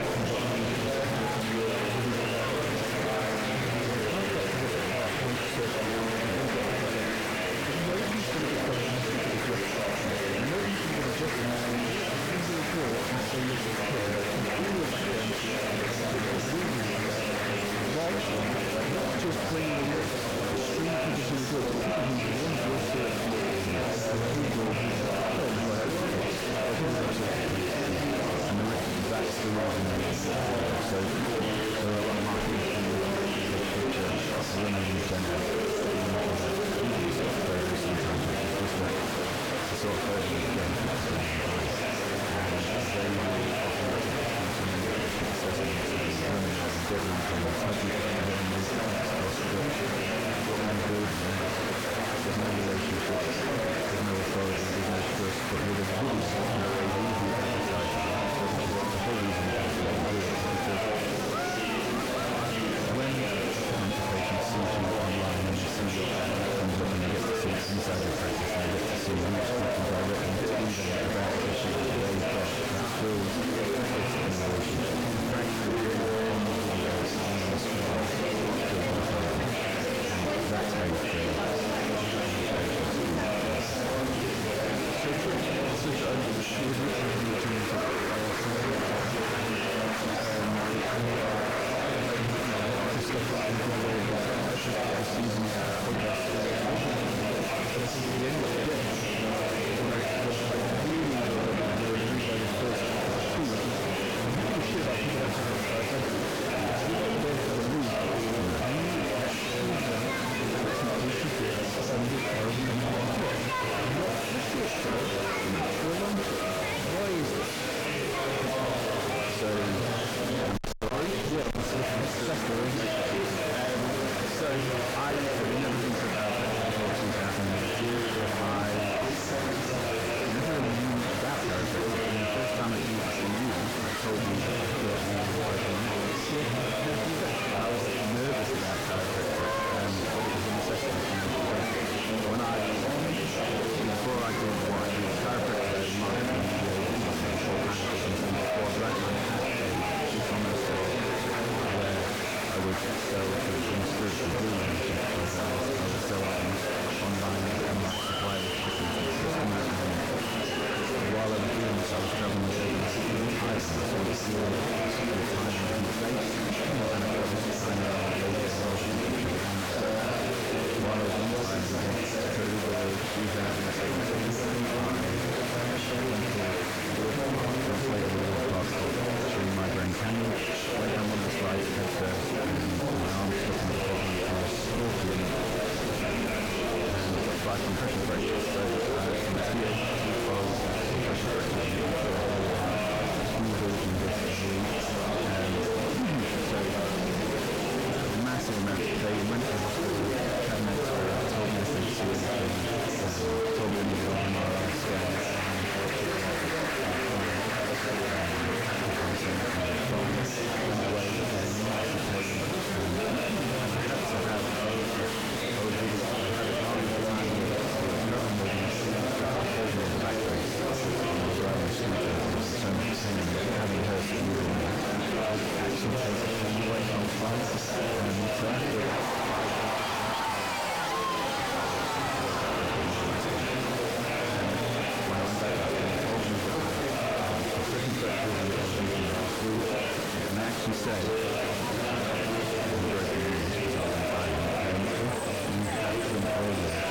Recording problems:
distortion; heavy; 4 dB below the speech
murmuring crowd; very loud; throughout; 1 dB above the speech
phone ringing; noticeable; from 1:56 to 2:00; peak 4 dB below the speech

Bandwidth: 17.5 kHz